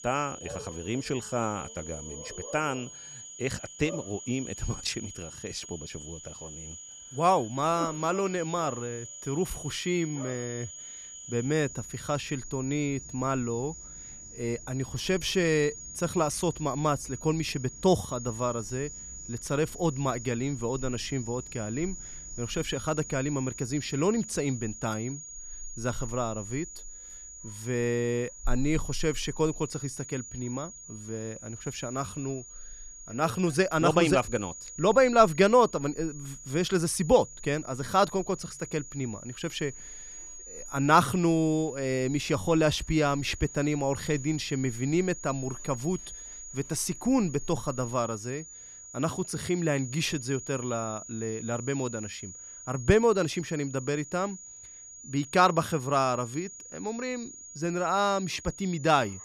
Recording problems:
high-pitched whine; noticeable; throughout; 7 kHz, 15 dB below the speech
animal sounds; faint; throughout; 25 dB below the speech

